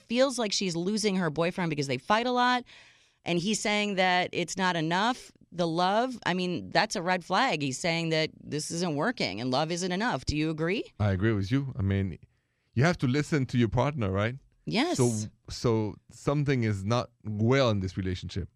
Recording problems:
none

